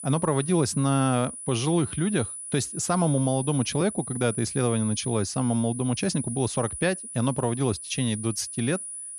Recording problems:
high-pitched whine; loud; throughout; 10 kHz, 8 dB below the speech

